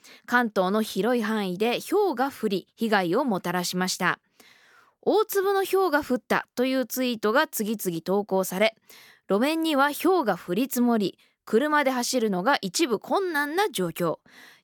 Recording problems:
none

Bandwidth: 18 kHz